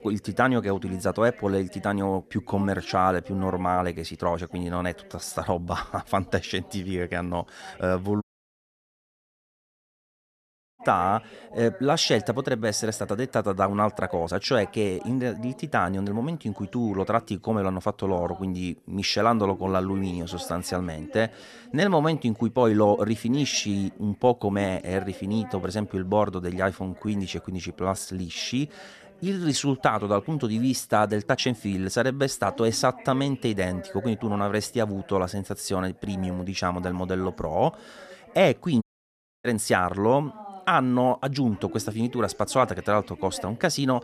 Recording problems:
background chatter; noticeable; throughout; 3 voices, 20 dB below the speech
uneven, jittery; strongly; from 5 to 32 s
audio cutting out; at 8 s for 2.5 s and at 39 s for 0.5 s

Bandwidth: 13.5 kHz